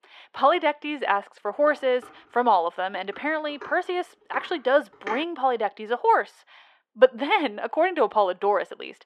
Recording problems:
muffled; slightly; fading above 4 kHz
thin; somewhat; fading below 550 Hz
clattering dishes; faint; from 1.5 to 5 s; peak 10 dB below the speech

